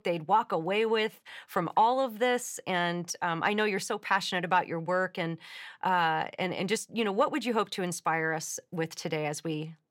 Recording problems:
none

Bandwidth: 16.5 kHz